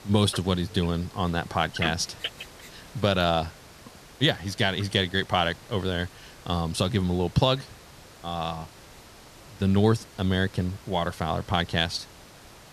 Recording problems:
hiss; faint; throughout; 20 dB below the speech

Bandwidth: 14 kHz